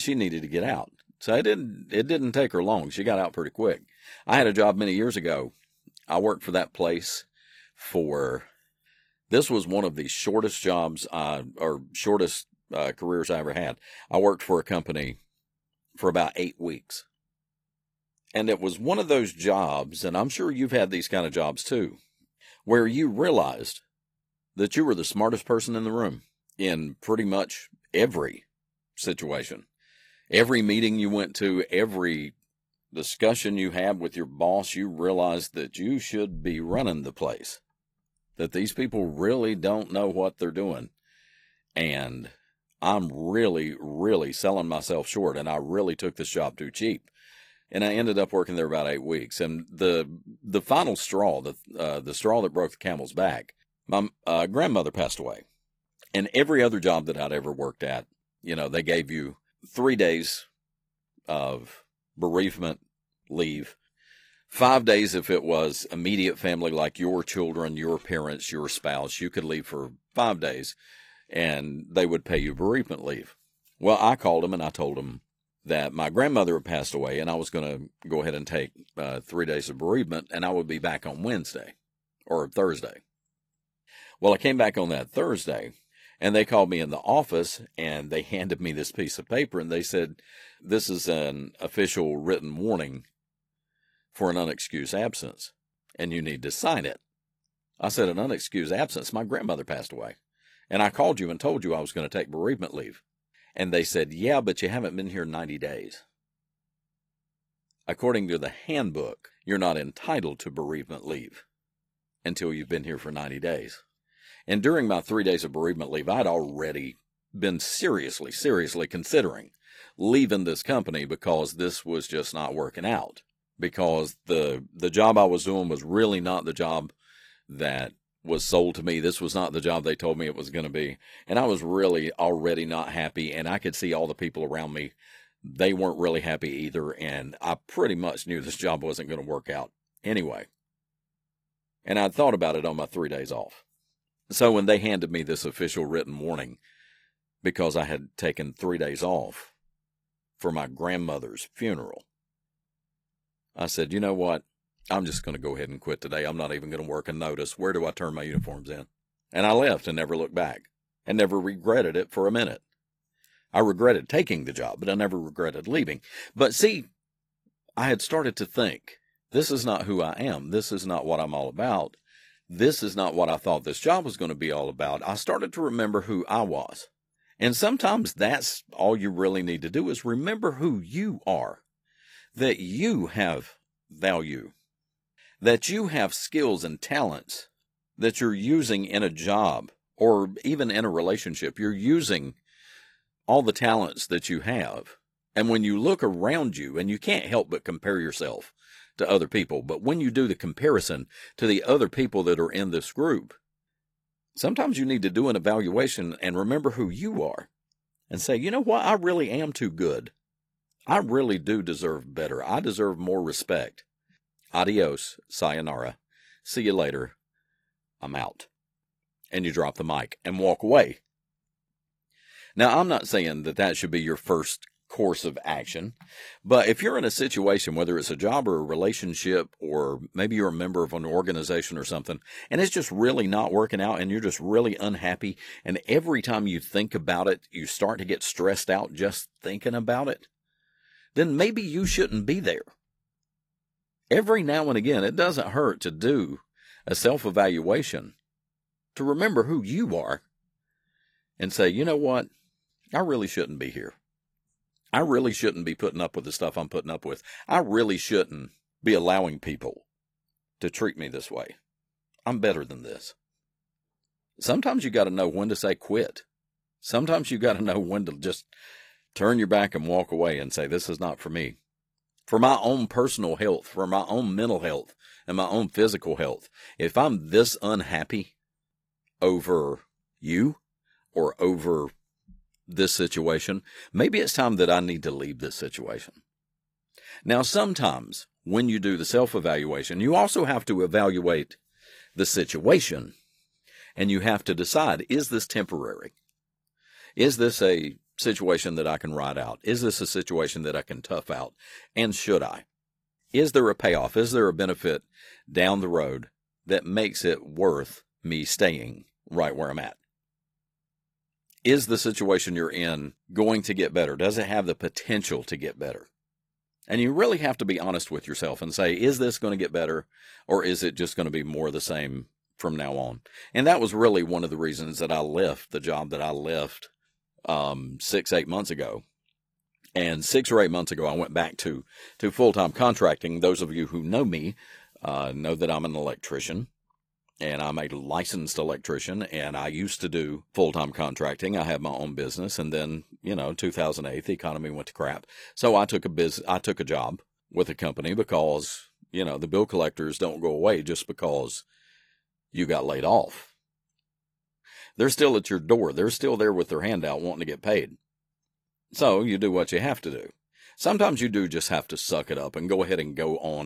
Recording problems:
garbled, watery; slightly; nothing above 14.5 kHz
abrupt cut into speech; at the start and the end

